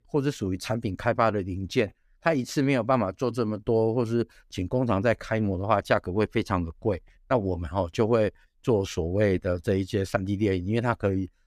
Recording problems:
none

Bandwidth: 15 kHz